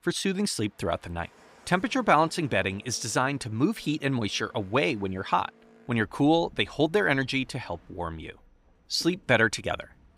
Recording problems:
train or aircraft noise; faint; throughout; 30 dB below the speech

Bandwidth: 15.5 kHz